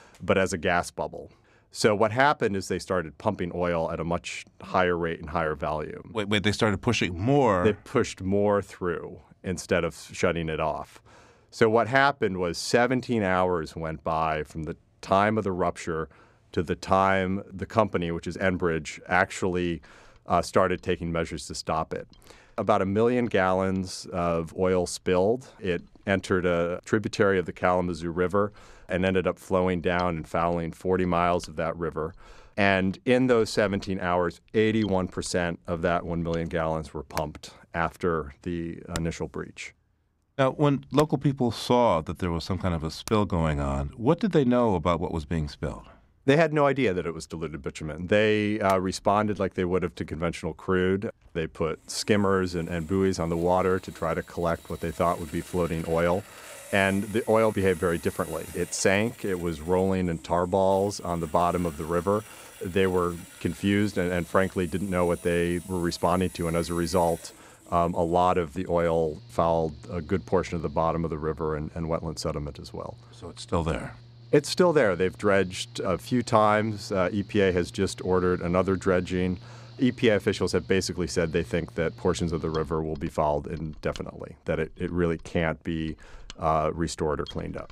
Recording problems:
machinery noise; faint; throughout; 20 dB below the speech

